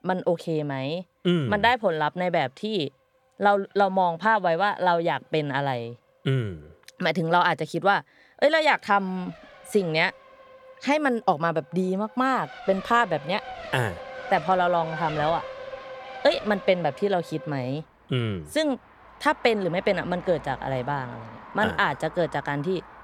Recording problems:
traffic noise; noticeable; throughout; 15 dB below the speech

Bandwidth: 18 kHz